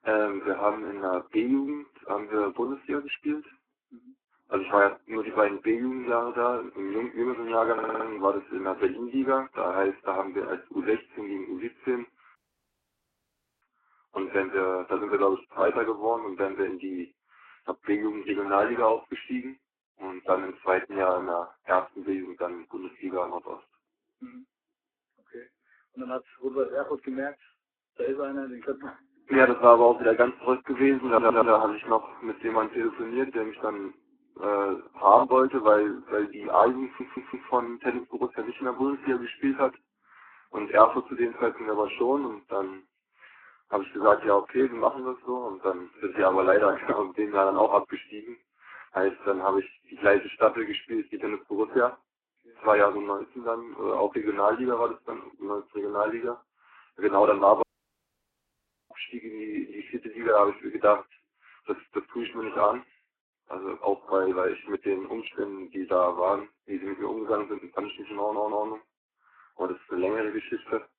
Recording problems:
garbled, watery; badly
phone-call audio
audio stuttering; 4 times, first at 7.5 s
audio cutting out; at 12 s for 1.5 s and at 58 s for 1.5 s

